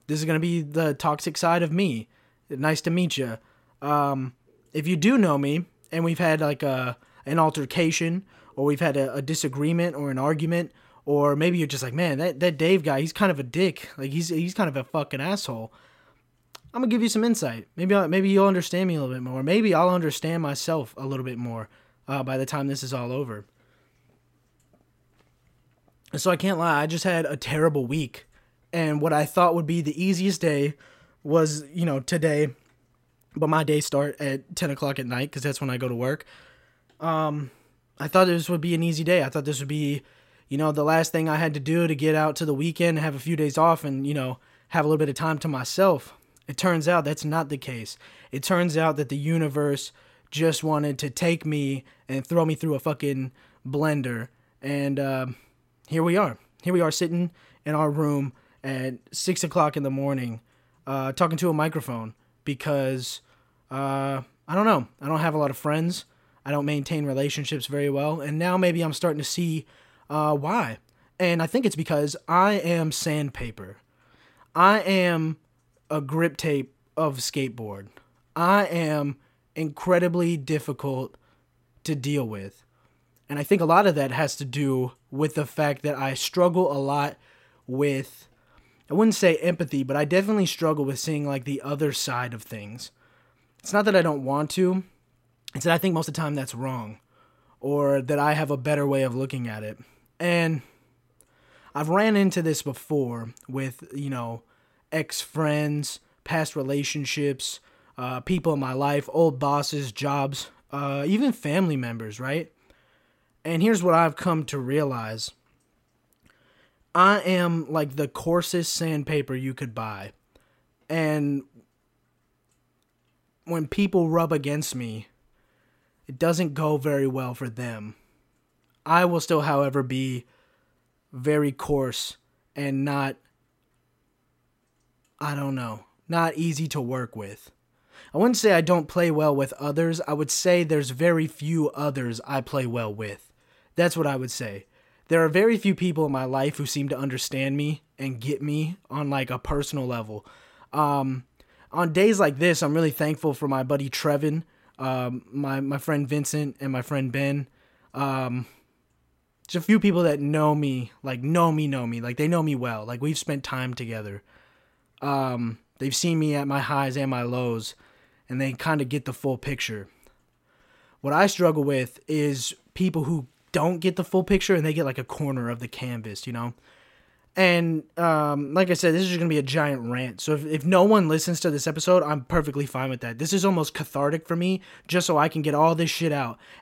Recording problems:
uneven, jittery; strongly; from 15 s to 2:59

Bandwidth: 16 kHz